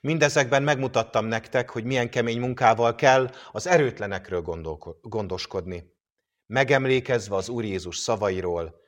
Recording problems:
none

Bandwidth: 16 kHz